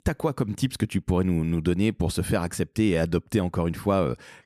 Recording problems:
none

